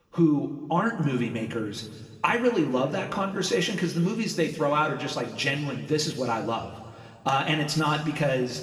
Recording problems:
room echo; noticeable; dies away in 1.7 s
off-mic speech; somewhat distant

